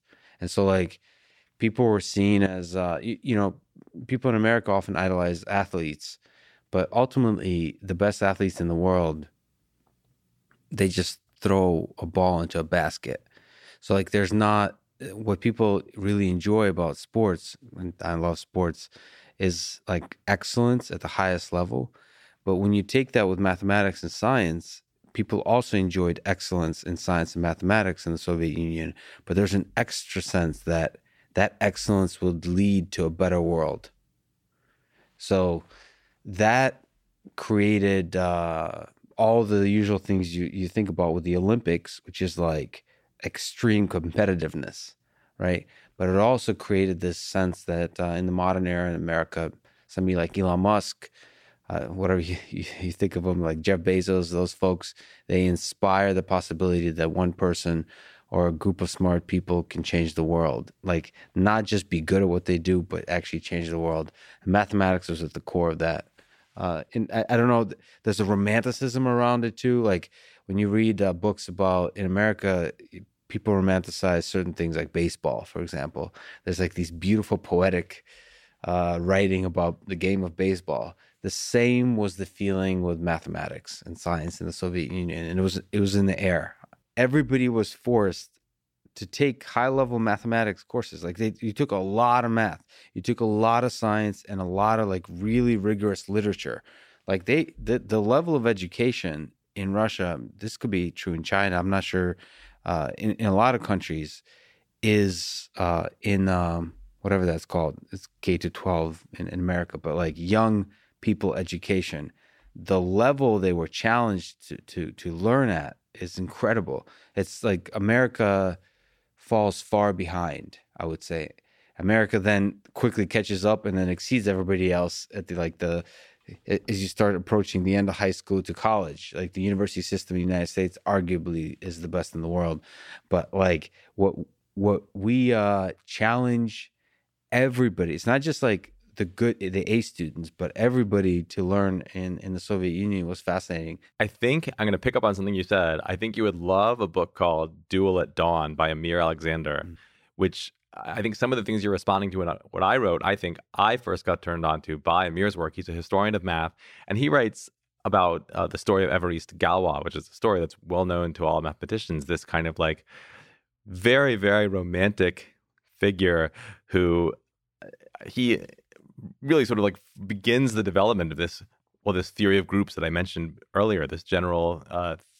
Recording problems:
none

